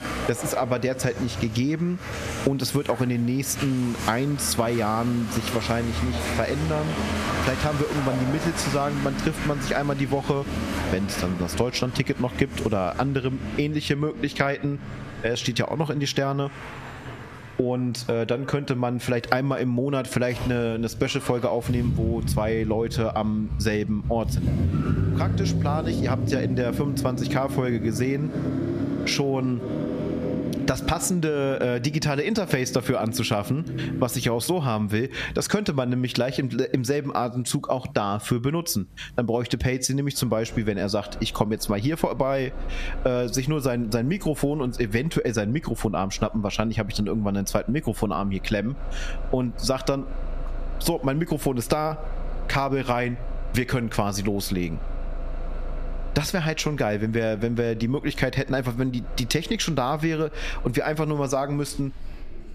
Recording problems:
squashed, flat; somewhat, background pumping
traffic noise; loud; throughout; 6 dB below the speech

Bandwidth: 14.5 kHz